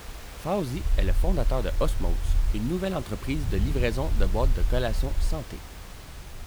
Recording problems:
wind noise on the microphone; occasional gusts; 25 dB below the speech
hiss; noticeable; throughout; 15 dB below the speech
low rumble; faint; from 1 to 2.5 s and from 4 to 5.5 s; 20 dB below the speech

